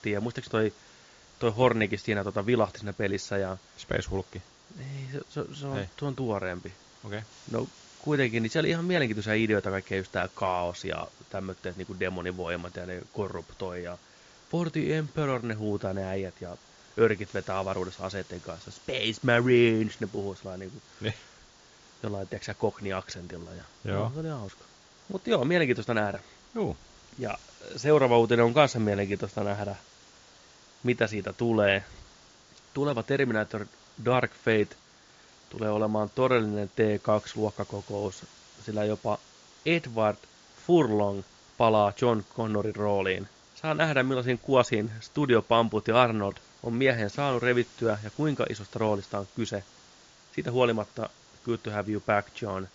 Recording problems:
high frequencies cut off; noticeable; nothing above 7 kHz
hiss; faint; throughout; 25 dB below the speech

